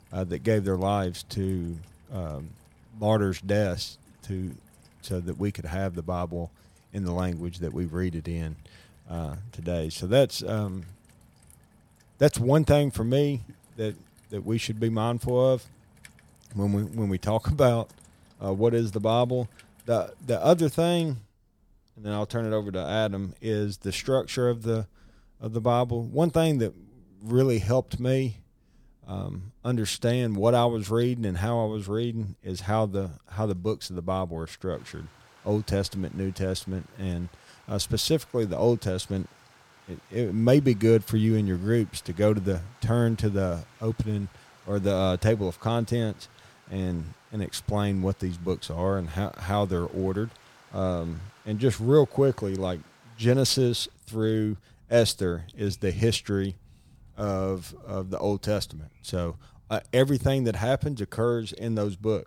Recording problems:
rain or running water; faint; throughout; 30 dB below the speech

